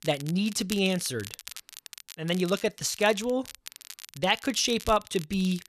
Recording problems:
crackle, like an old record; noticeable; 15 dB below the speech

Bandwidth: 13.5 kHz